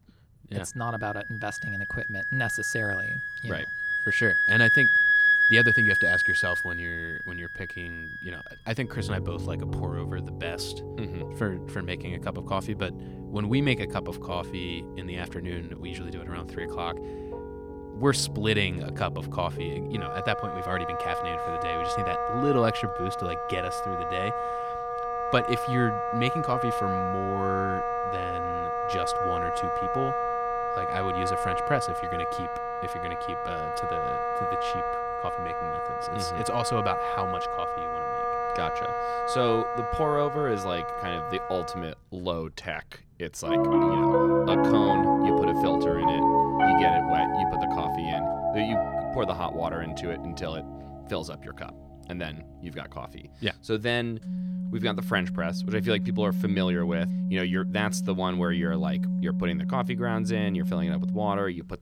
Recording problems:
background music; very loud; throughout; 5 dB above the speech

